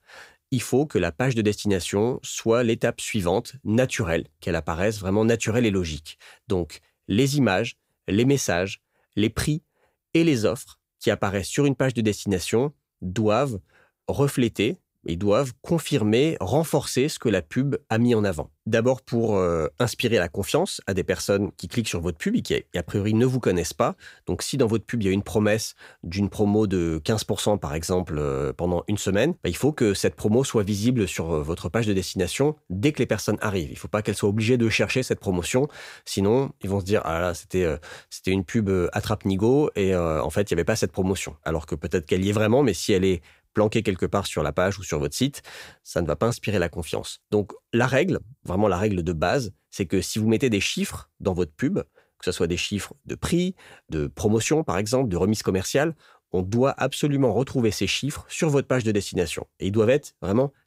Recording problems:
none

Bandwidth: 15.5 kHz